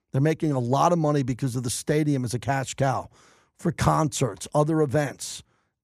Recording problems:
none

